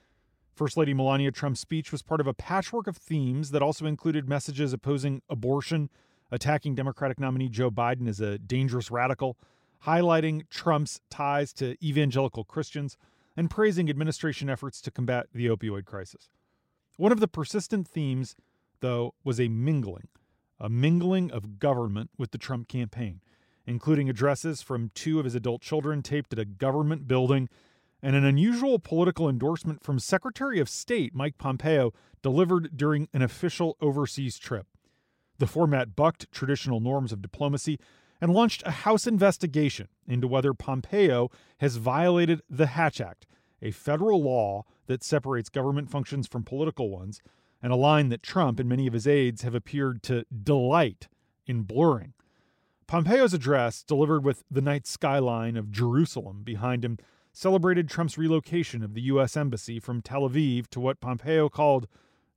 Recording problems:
none

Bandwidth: 16 kHz